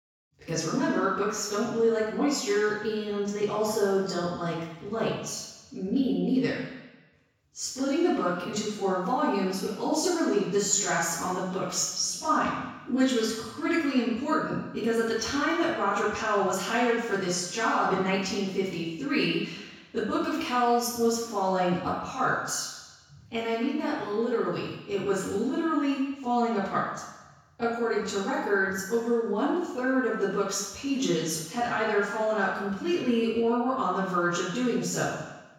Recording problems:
off-mic speech; far
room echo; noticeable; dies away in 1.1 s

